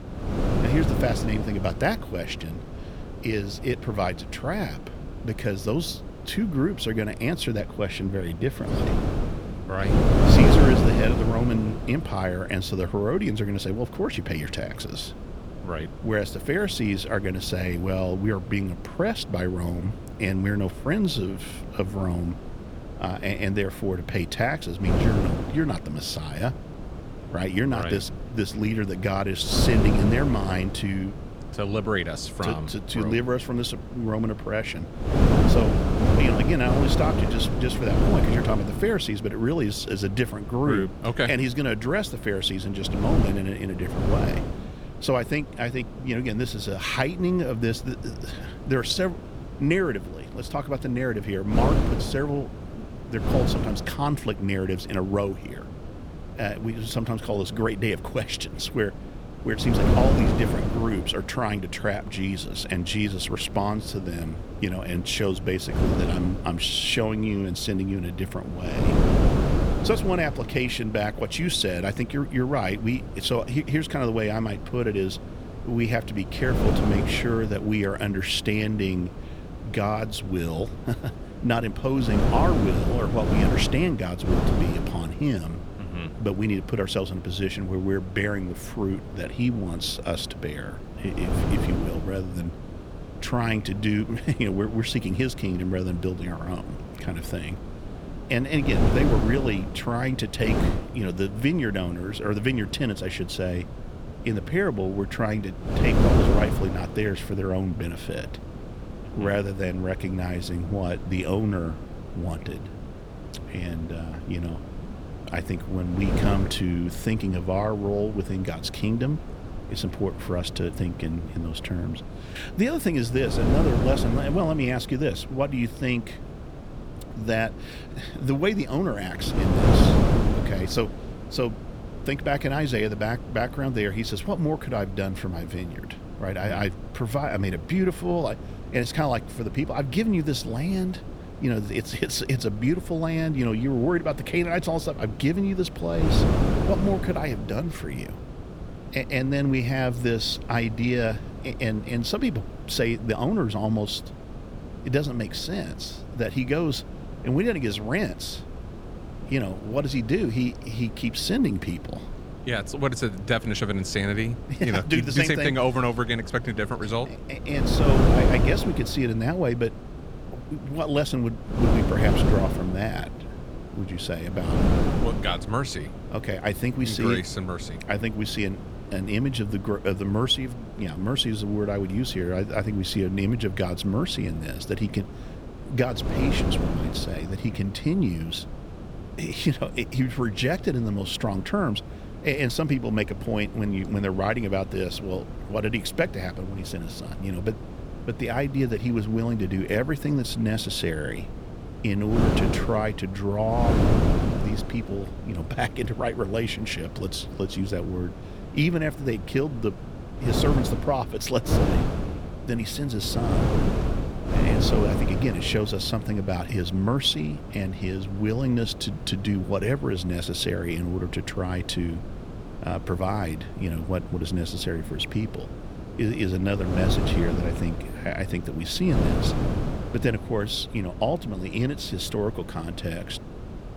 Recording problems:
wind noise on the microphone; heavy; 7 dB below the speech

